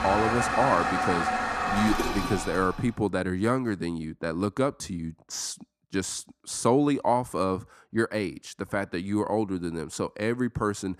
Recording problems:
household noises; very loud; until 2.5 s; 1 dB above the speech

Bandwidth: 14.5 kHz